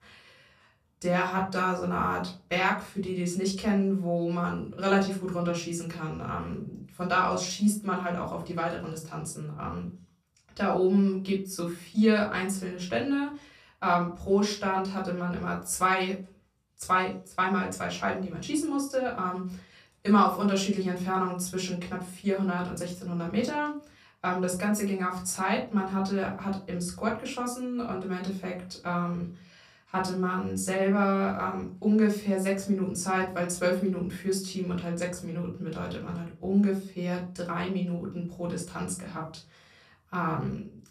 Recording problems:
off-mic speech; far
room echo; slight; dies away in 0.3 s

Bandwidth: 14.5 kHz